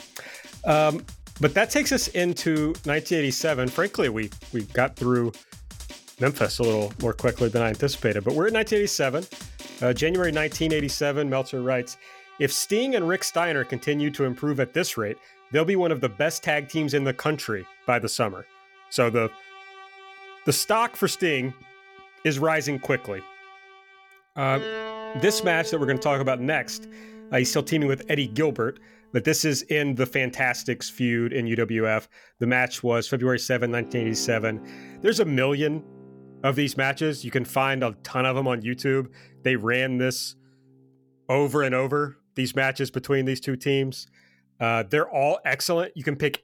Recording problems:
background music; noticeable; throughout; 20 dB below the speech

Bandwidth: 18.5 kHz